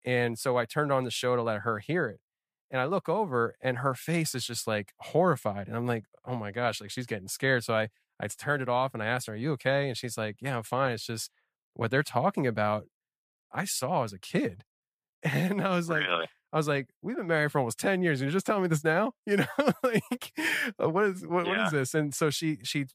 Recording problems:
none

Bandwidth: 15 kHz